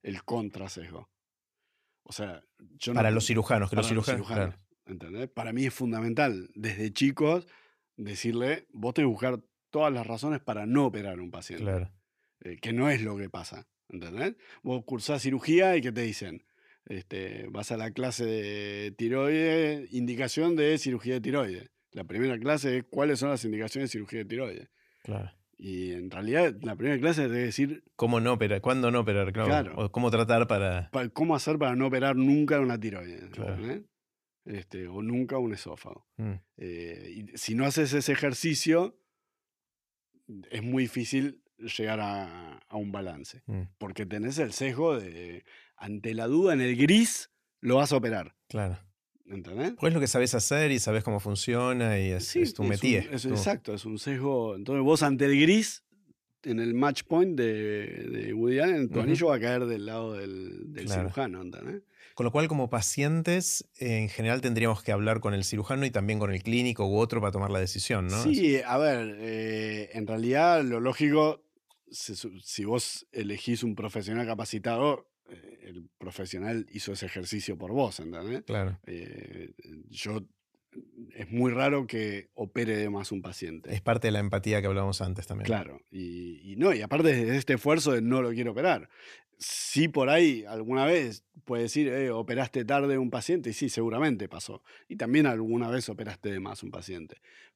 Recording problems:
none

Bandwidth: 14.5 kHz